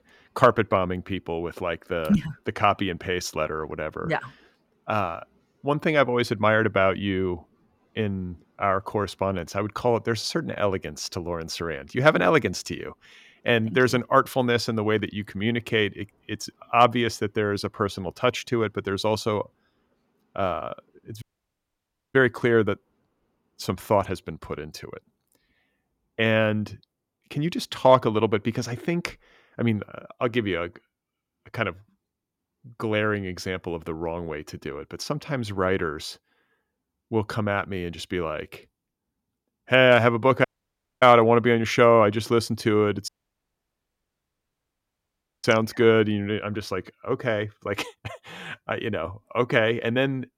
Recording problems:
audio cutting out; at 21 s for 1 s, at 40 s for 0.5 s and at 43 s for 2.5 s

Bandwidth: 16.5 kHz